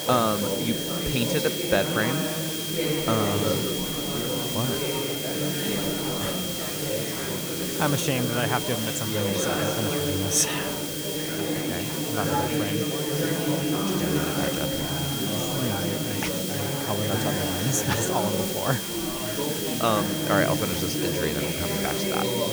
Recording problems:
chatter from many people; very loud; throughout; as loud as the speech
high-pitched whine; loud; throughout; 3 kHz, 6 dB below the speech
hiss; loud; throughout; 2 dB below the speech

